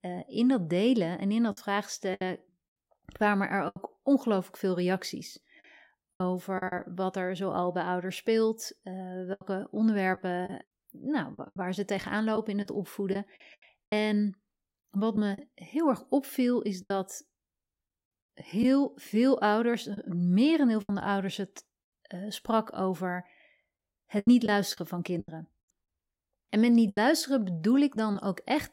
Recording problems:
choppy; very; 6% of the speech affected

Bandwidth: 16 kHz